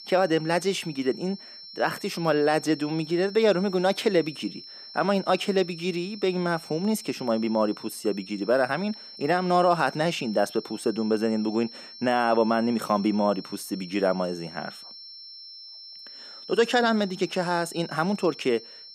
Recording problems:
high-pitched whine; noticeable; throughout; 5.5 kHz, 15 dB below the speech

